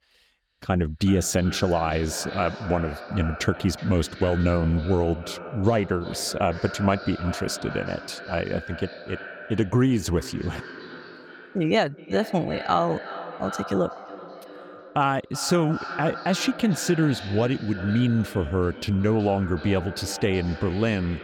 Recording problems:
echo of what is said; noticeable; throughout; 370 ms later, 10 dB below the speech

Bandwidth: 17.5 kHz